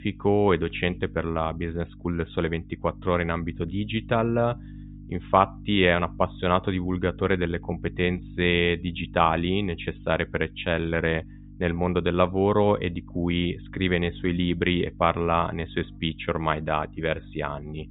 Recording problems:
high frequencies cut off; severe; nothing above 4 kHz
electrical hum; faint; throughout; 50 Hz, 25 dB below the speech

